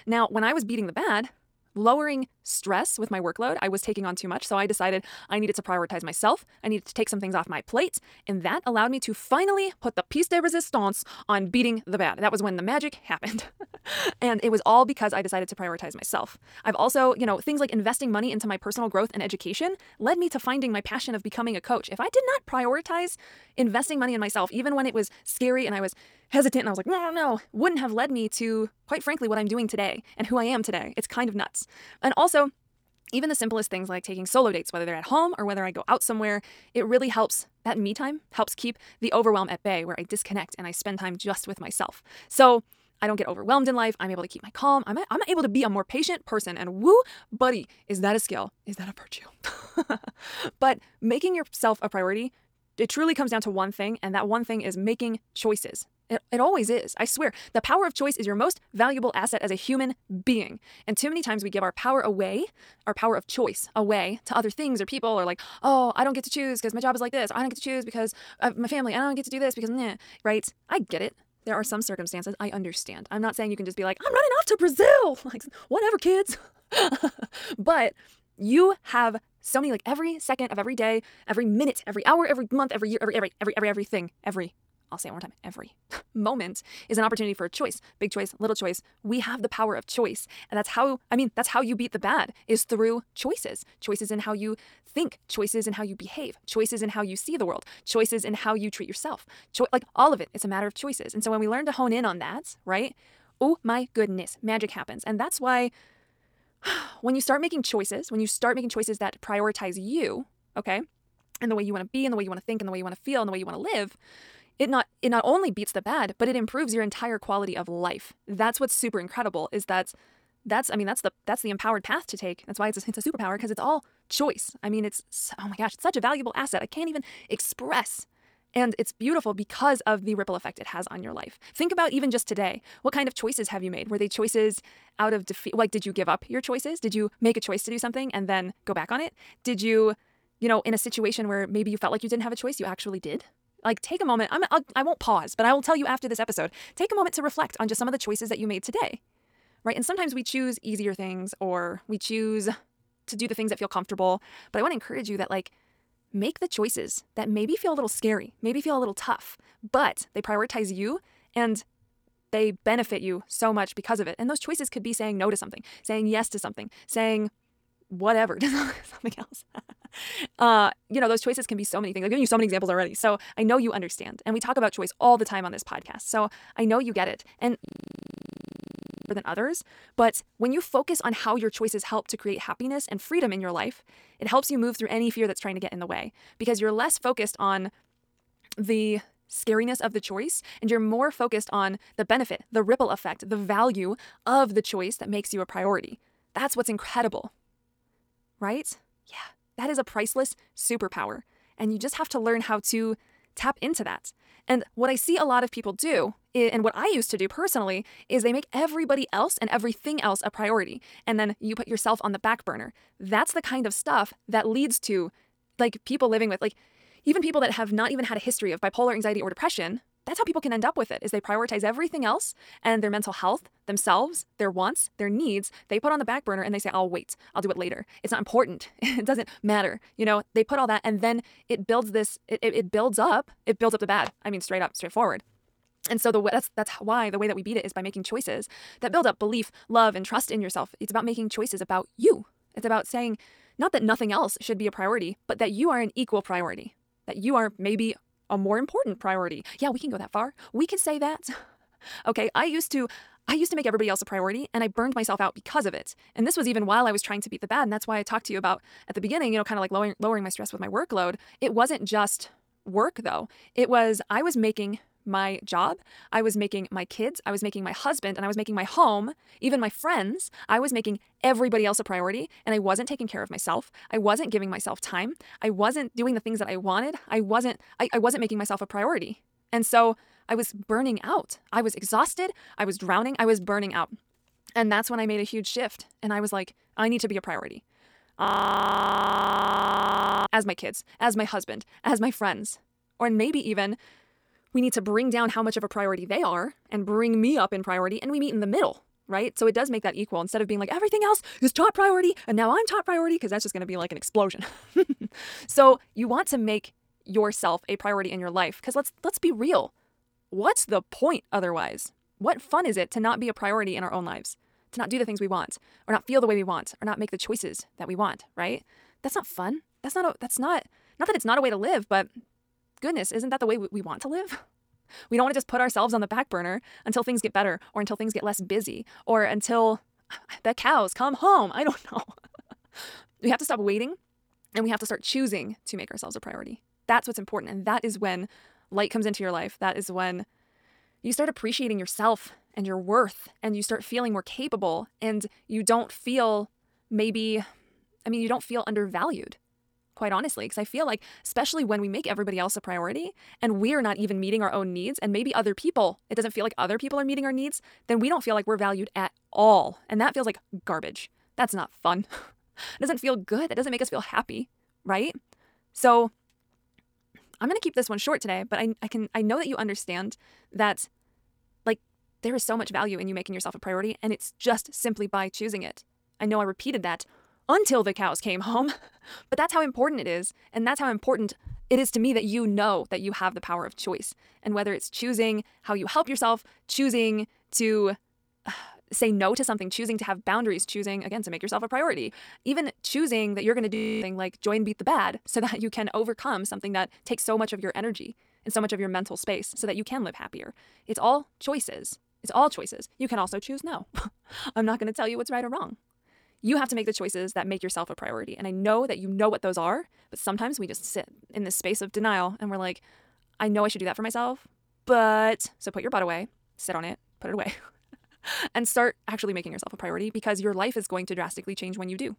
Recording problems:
wrong speed, natural pitch; too fast; 1.5 times normal speed
audio freezing; at 2:58 for 1.5 s, at 4:48 for 2 s and at 6:34

